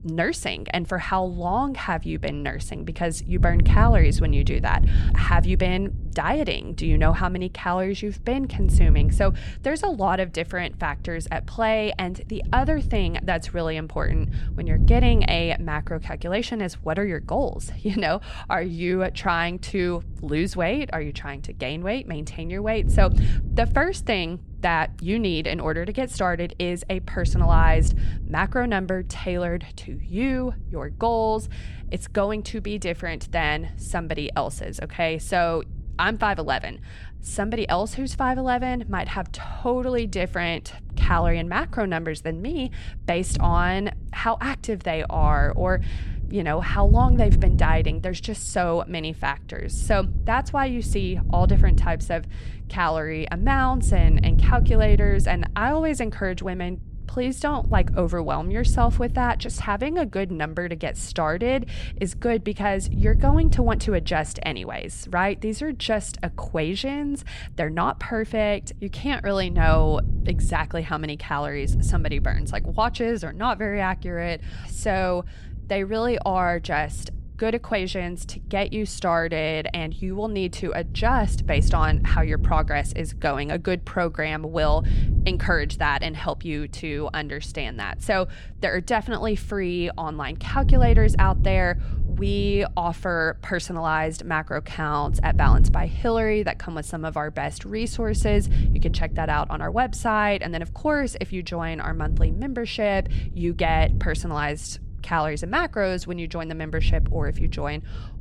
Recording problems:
wind noise on the microphone; occasional gusts; 15 dB below the speech

